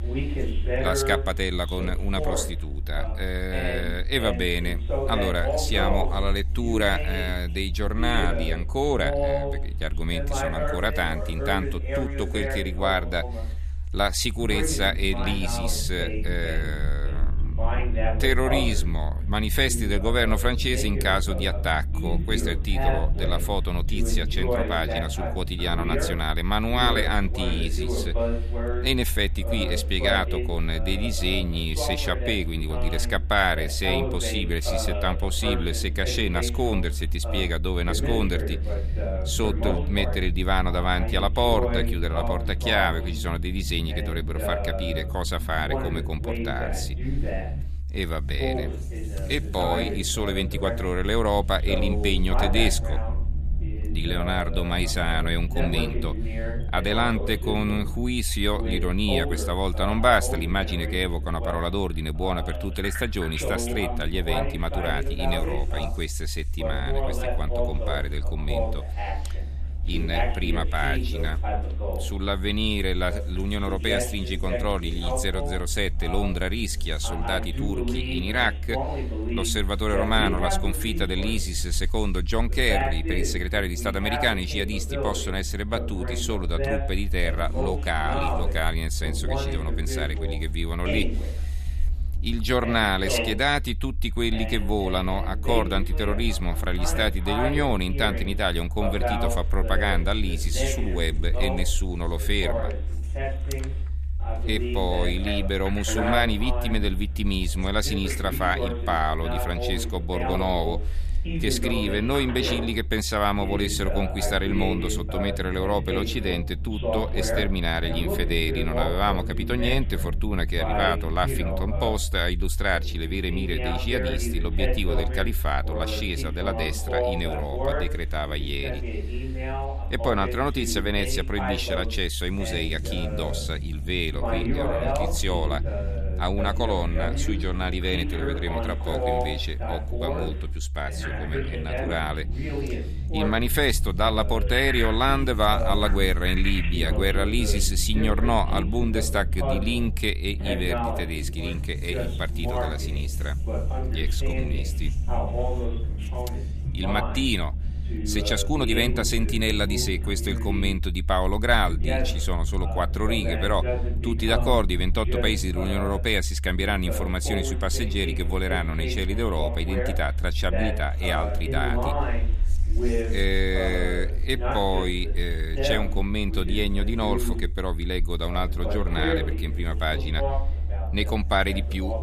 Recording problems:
voice in the background; loud; throughout; 5 dB below the speech
low rumble; faint; throughout; 25 dB below the speech

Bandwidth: 14.5 kHz